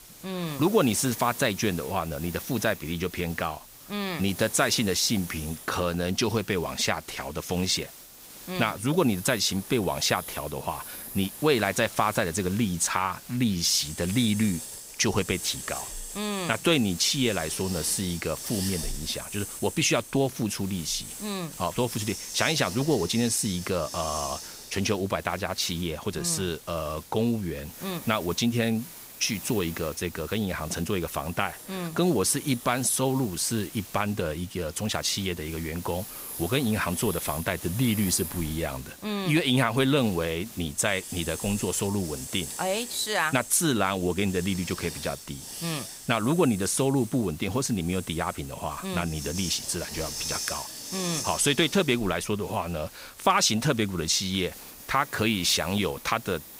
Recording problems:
hiss; noticeable; throughout; 10 dB below the speech

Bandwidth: 15.5 kHz